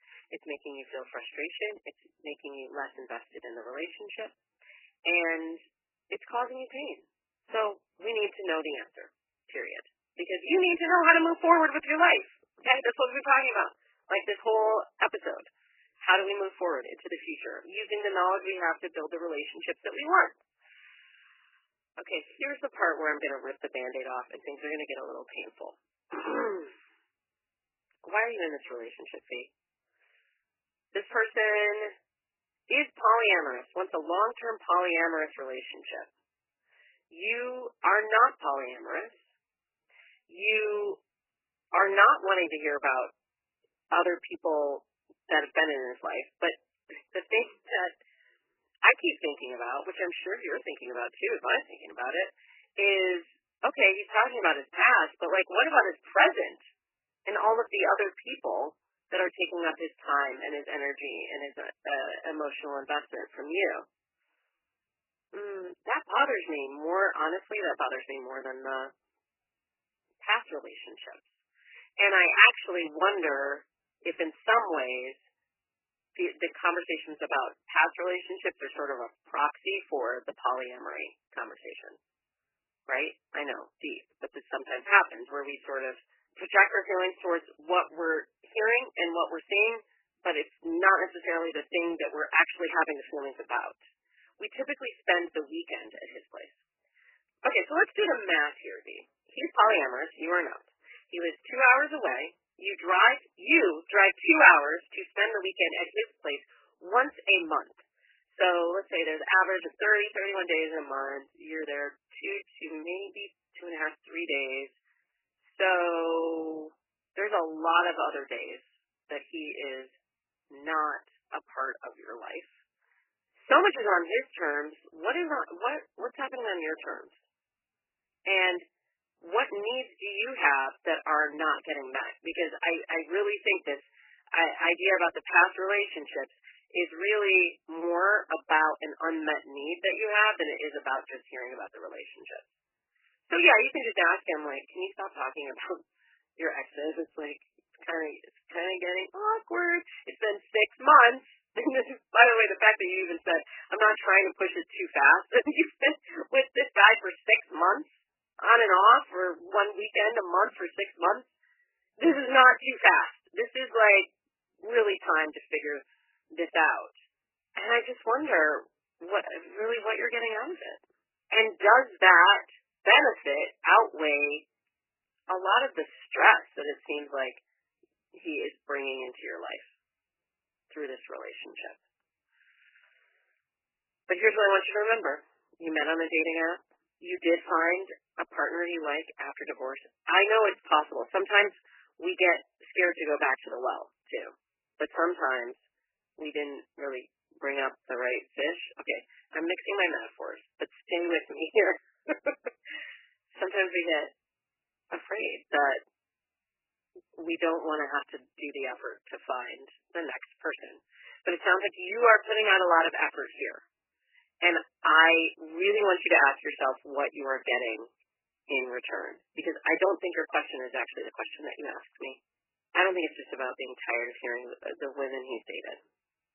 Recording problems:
garbled, watery; badly; nothing above 3 kHz
thin; very; fading below 300 Hz

